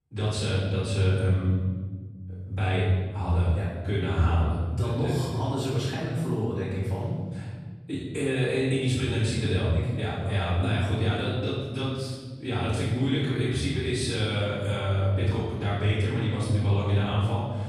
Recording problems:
room echo; strong; dies away in 1.9 s
off-mic speech; far

